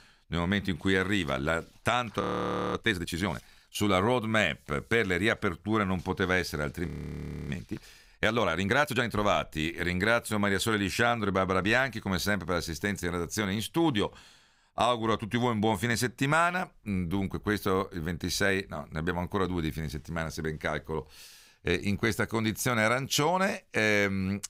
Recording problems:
audio freezing; at 2 s for 0.5 s and at 7 s for 0.5 s

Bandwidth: 15.5 kHz